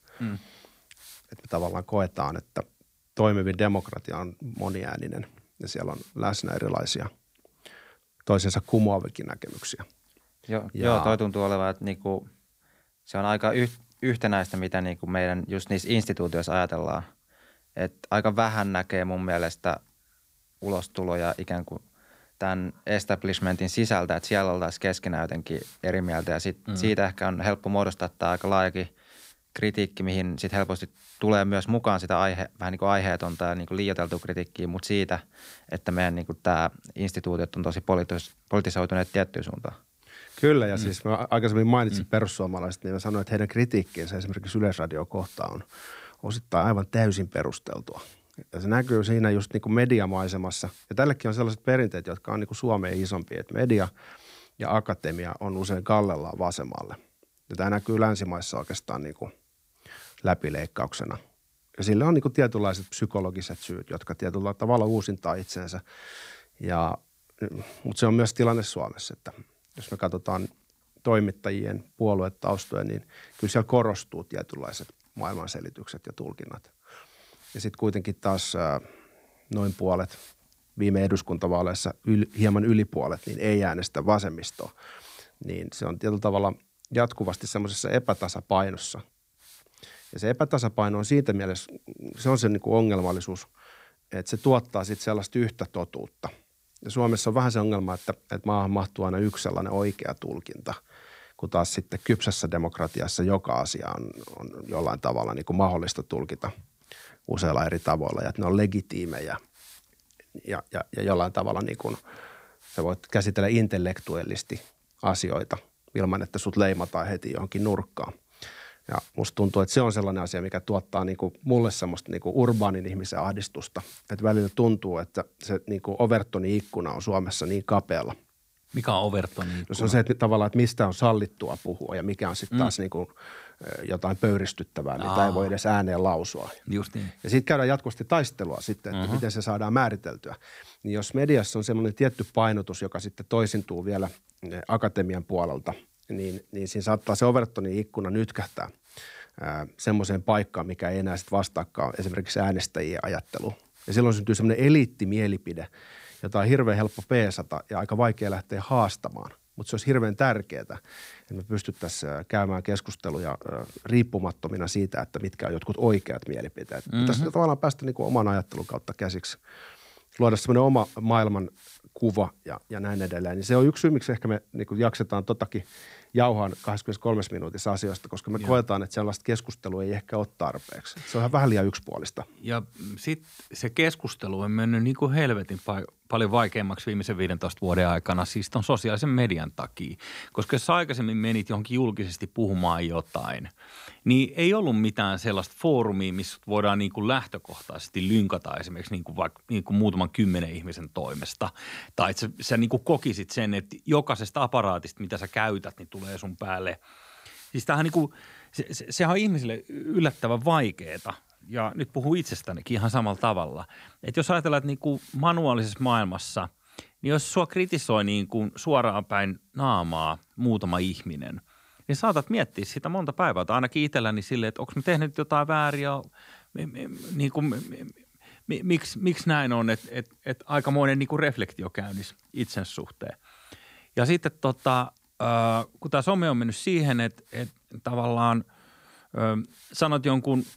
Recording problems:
hiss; faint; throughout; 25 dB below the speech

